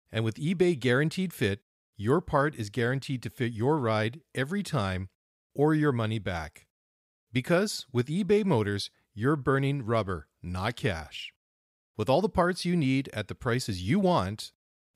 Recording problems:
none

